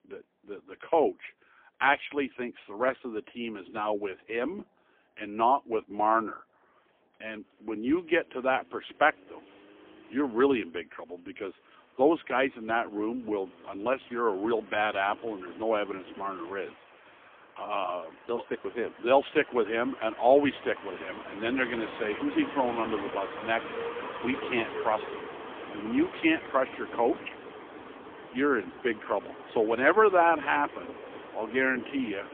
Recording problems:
phone-call audio; poor line; nothing above 3.5 kHz
traffic noise; noticeable; throughout; 15 dB below the speech

